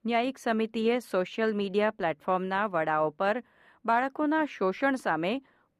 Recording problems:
muffled; slightly; fading above 3 kHz

